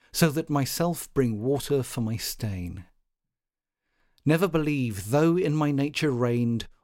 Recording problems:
none

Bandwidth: 16 kHz